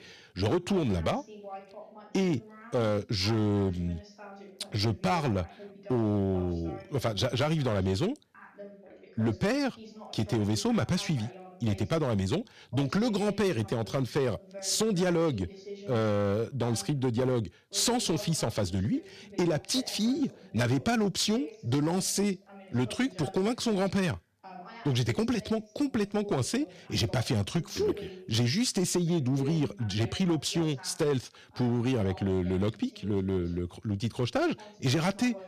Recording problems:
distortion; slight; 8% of the sound clipped
voice in the background; noticeable; throughout; 20 dB below the speech

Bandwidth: 14.5 kHz